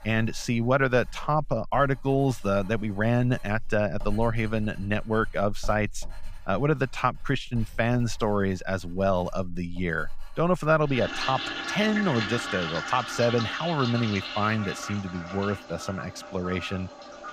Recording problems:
household noises; loud; throughout; 9 dB below the speech

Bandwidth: 14.5 kHz